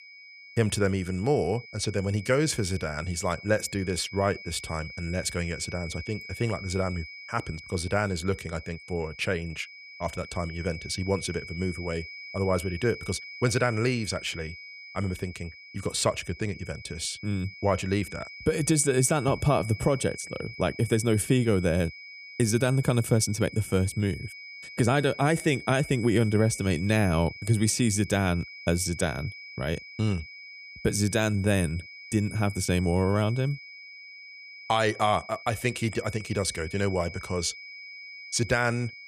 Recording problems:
high-pitched whine; noticeable; throughout; 2.5 kHz, 15 dB below the speech

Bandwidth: 14.5 kHz